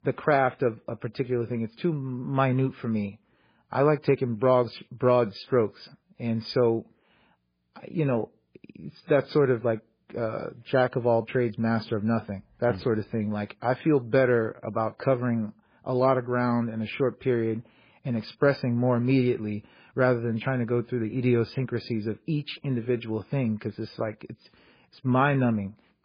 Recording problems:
garbled, watery; badly; nothing above 5 kHz

